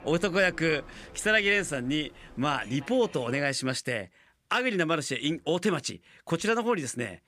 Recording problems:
train or aircraft noise; faint; until 3.5 s; 20 dB below the speech

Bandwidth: 15 kHz